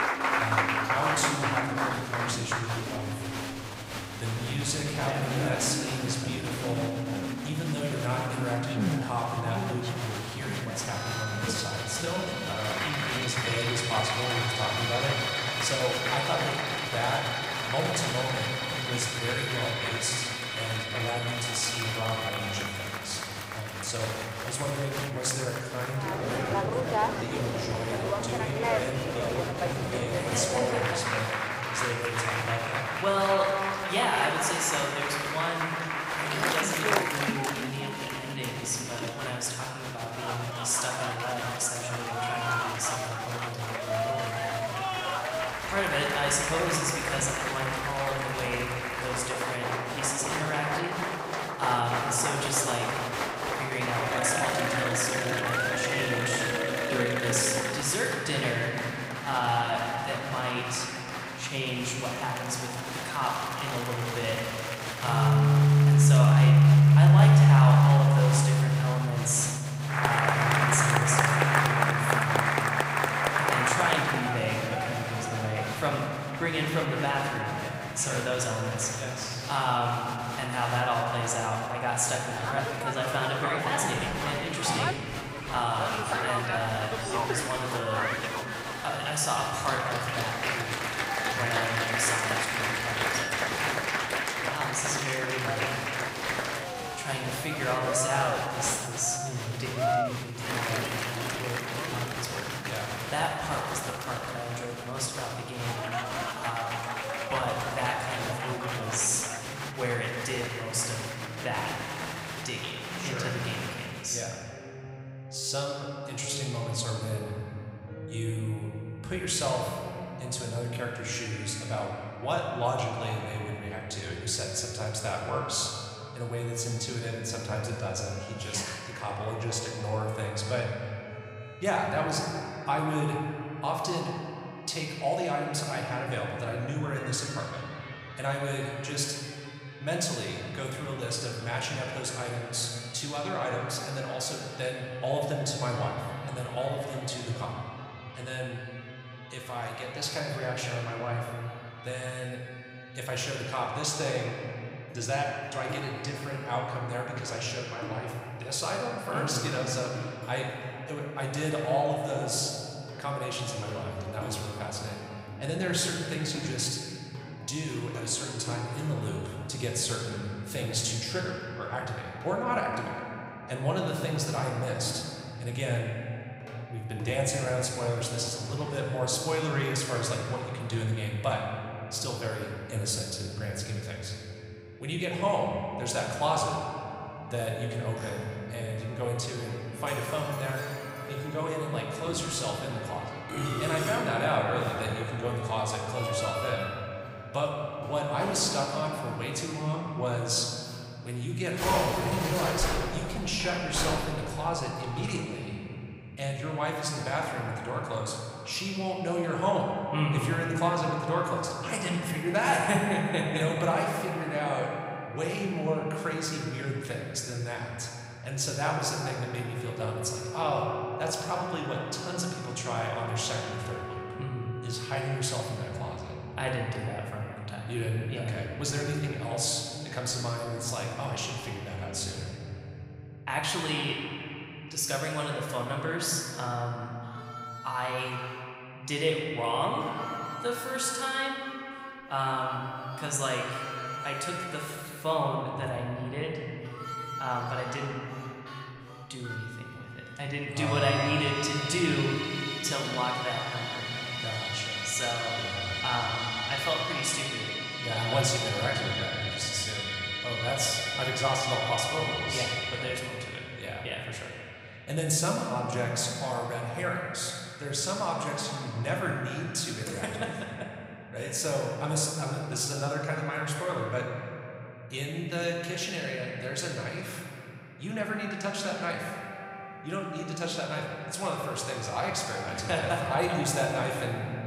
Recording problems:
room echo; noticeable; dies away in 3 s
off-mic speech; somewhat distant
crowd noise; loud; until 1:54; 1 dB below the speech
background music; very faint; throughout; as loud as the speech

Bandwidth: 15.5 kHz